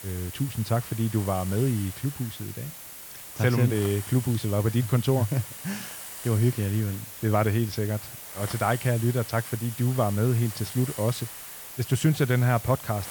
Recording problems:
hiss; noticeable; throughout; 10 dB below the speech

